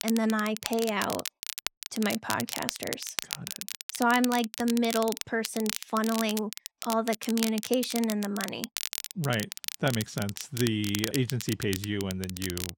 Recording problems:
crackle, like an old record; loud; 6 dB below the speech

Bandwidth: 16.5 kHz